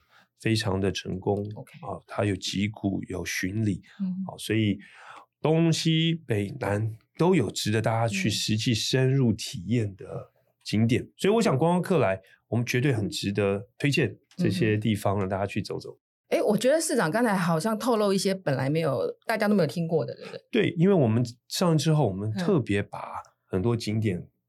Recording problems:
none

